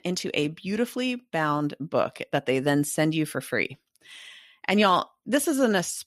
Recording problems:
none

